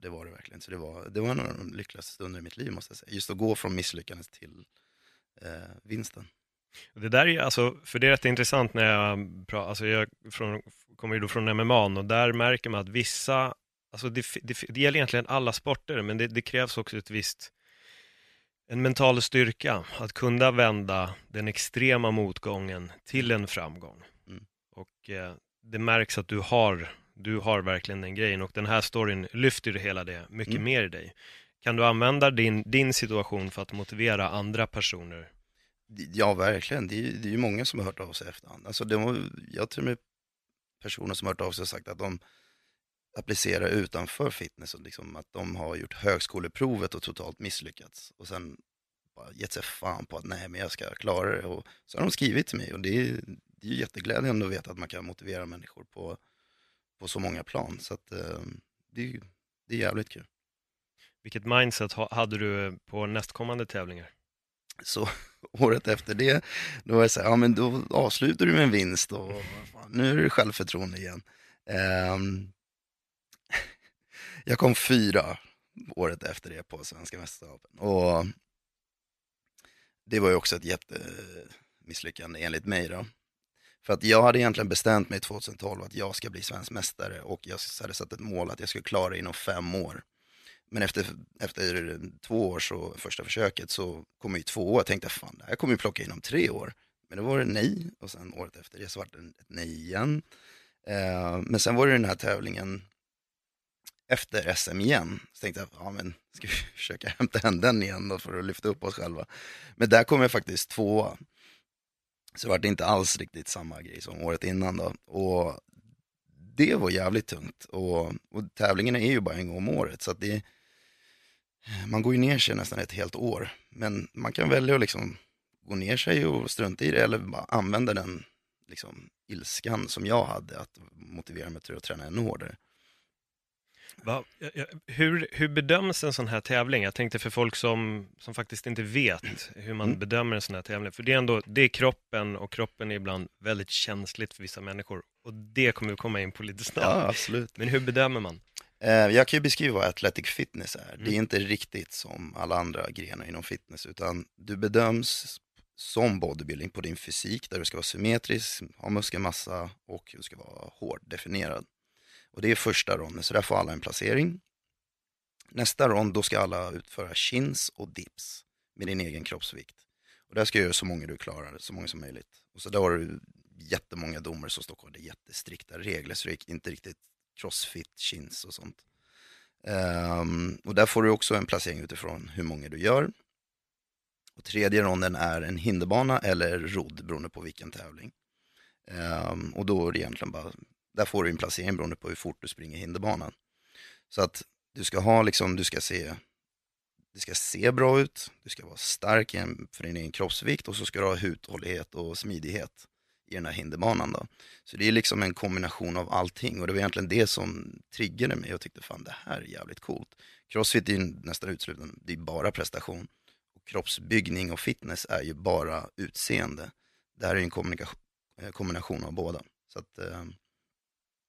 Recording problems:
none

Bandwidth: 14 kHz